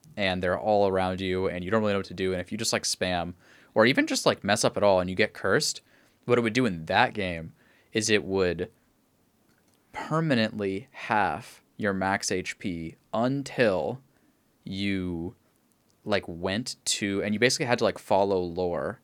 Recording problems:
none

